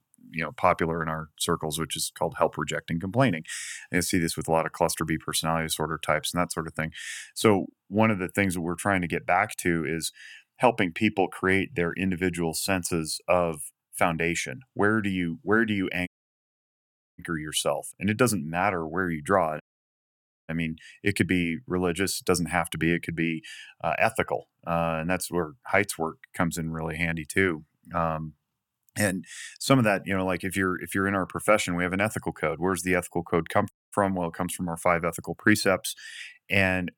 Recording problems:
audio cutting out; at 16 s for 1 s, at 20 s for 1 s and at 34 s

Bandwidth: 17.5 kHz